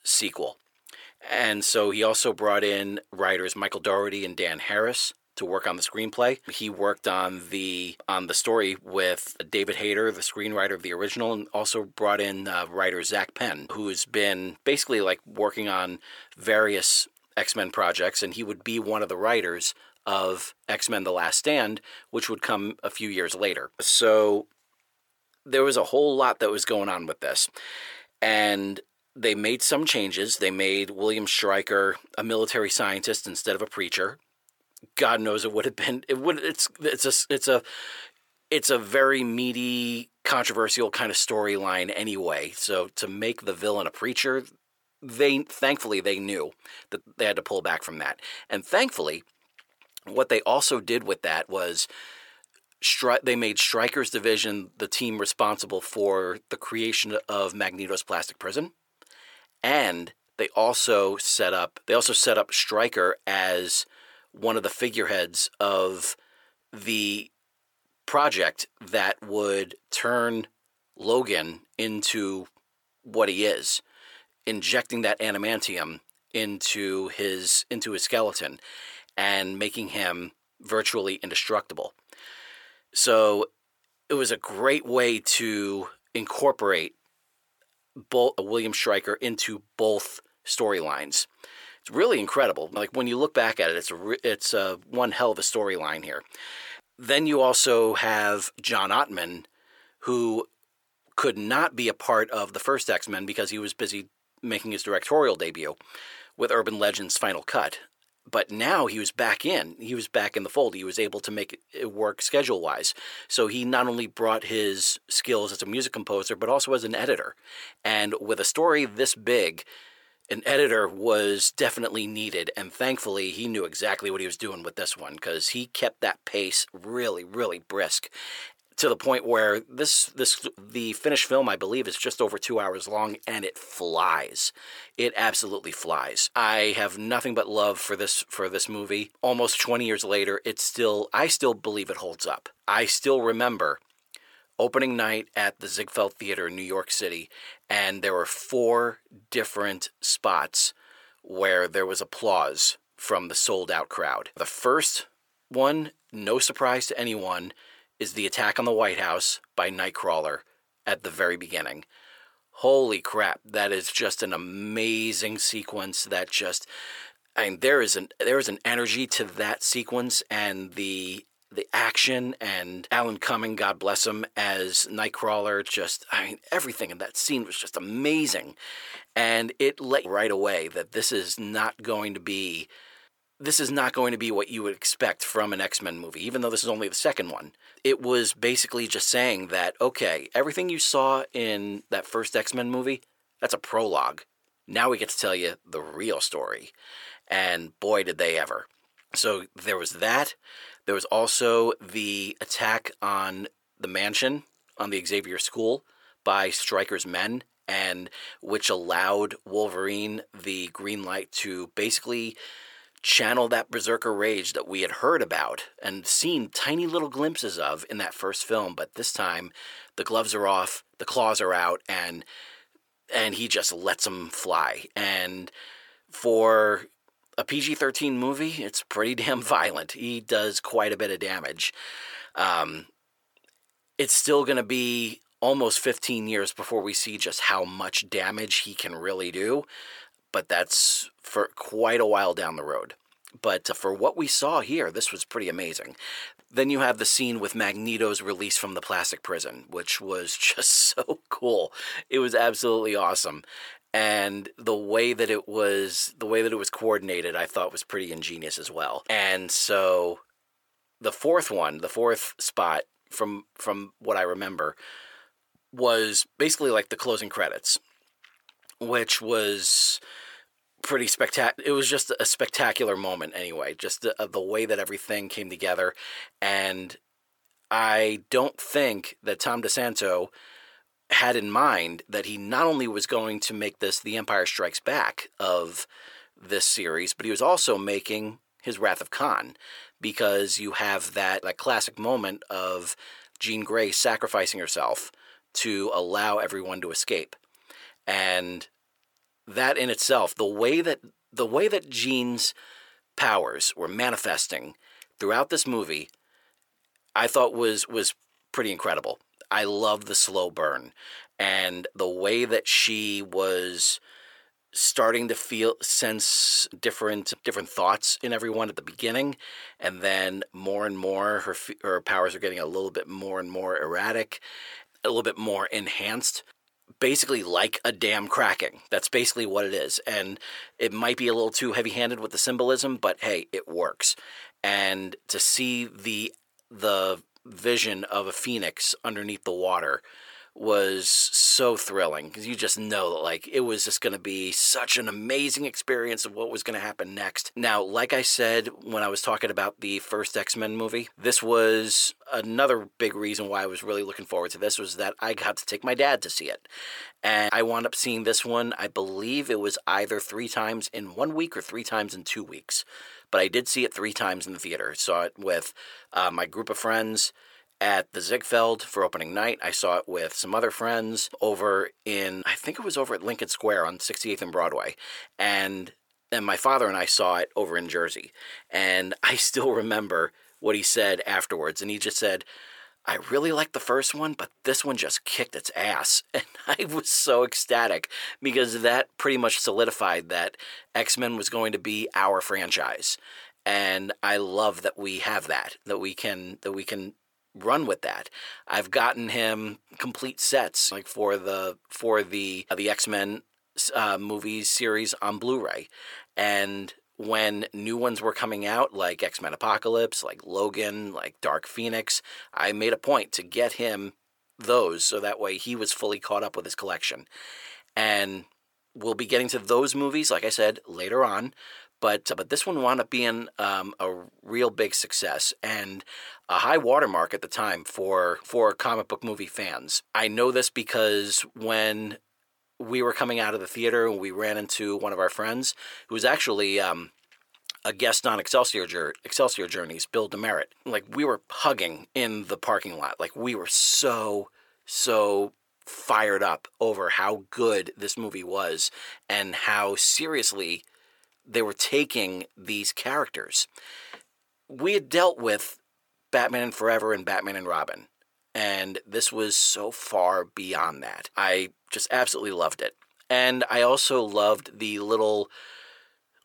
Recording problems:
thin; somewhat; fading below 450 Hz

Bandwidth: 18.5 kHz